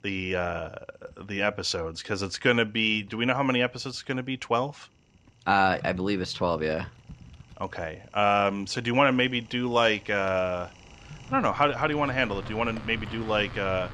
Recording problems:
household noises; noticeable; throughout; 20 dB below the speech

